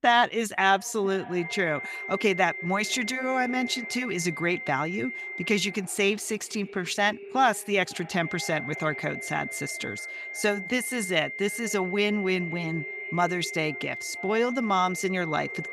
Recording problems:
echo of what is said; faint; throughout; 480 ms later, 20 dB below the speech
high-pitched whine; loud; from 1.5 to 5.5 s and from 8 s on; 2 kHz, 7 dB below the speech

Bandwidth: 15.5 kHz